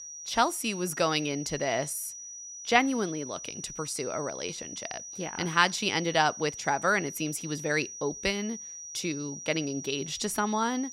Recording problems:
high-pitched whine; loud; throughout; 6 kHz, 10 dB below the speech

